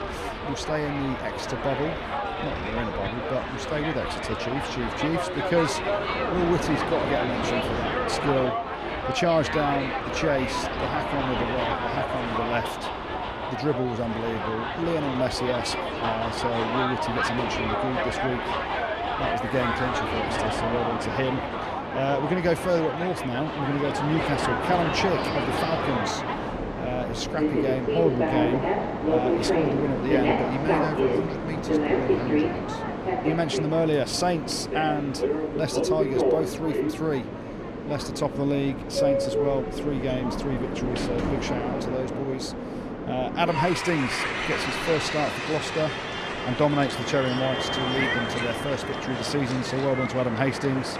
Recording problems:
train or aircraft noise; very loud; throughout; 1 dB above the speech

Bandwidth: 14.5 kHz